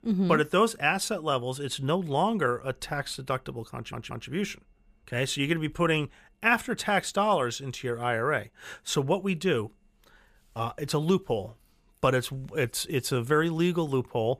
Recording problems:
audio stuttering; at 4 s

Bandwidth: 14.5 kHz